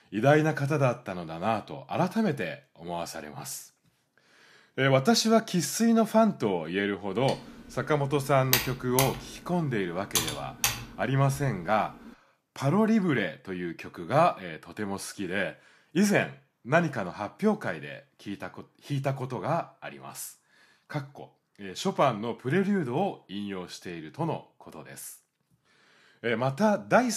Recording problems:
keyboard typing; loud; from 7.5 to 11 s; peak 2 dB above the speech
abrupt cut into speech; at the end

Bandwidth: 14.5 kHz